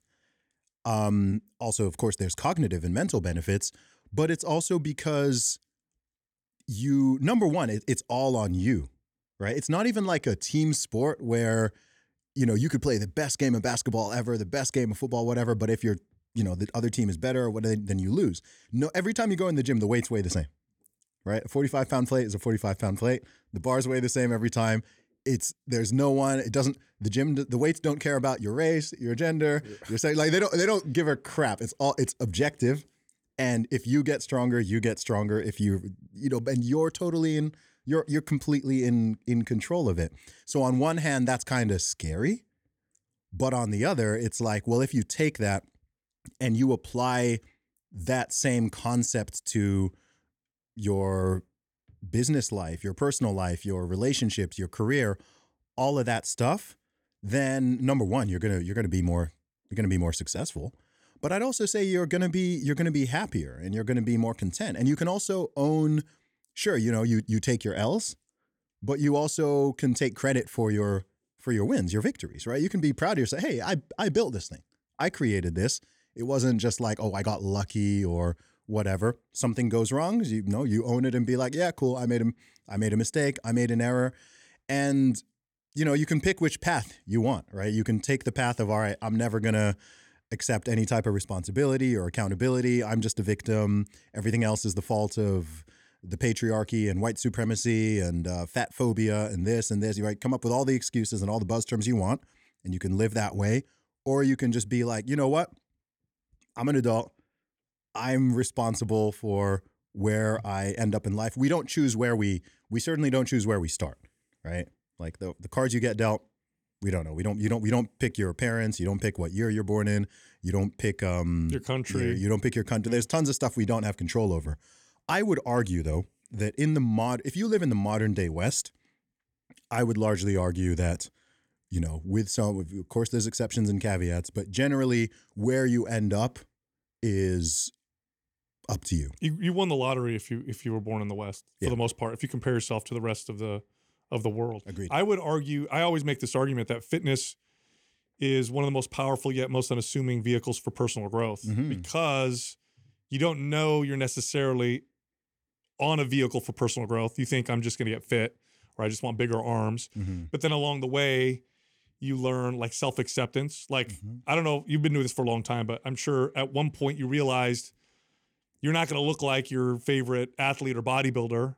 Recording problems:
none

